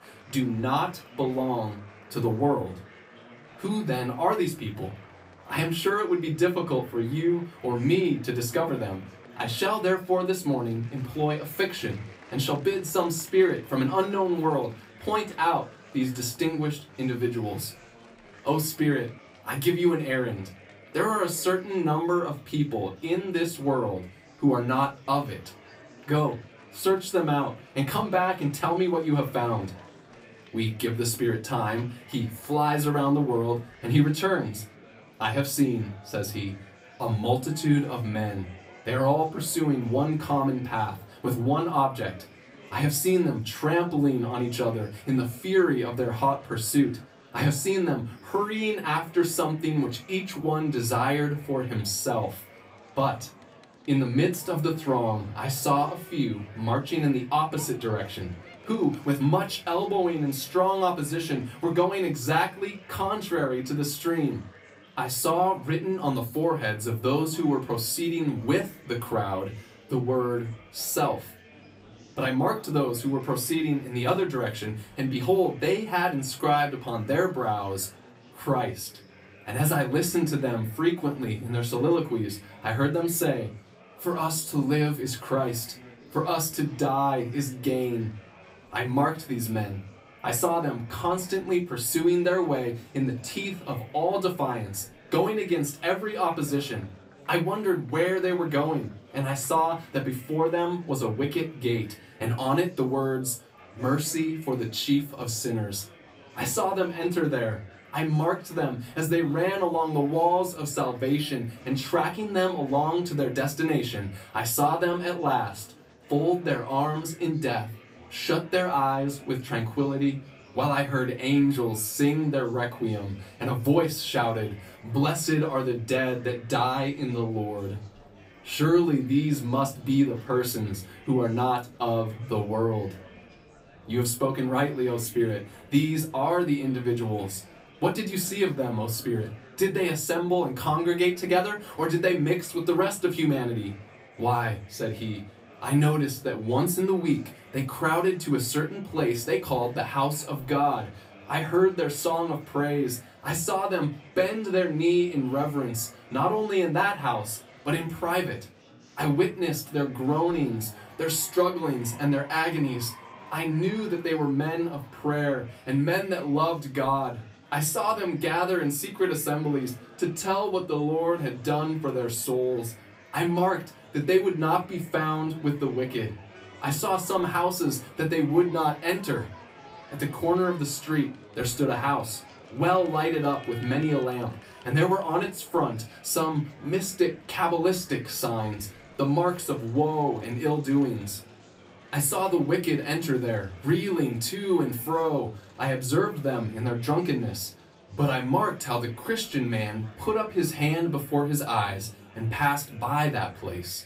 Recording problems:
off-mic speech; far
room echo; very slight; dies away in 0.2 s
murmuring crowd; faint; throughout; 25 dB below the speech

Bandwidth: 15.5 kHz